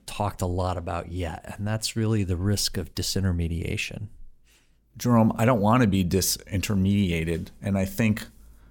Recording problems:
none

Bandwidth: 17.5 kHz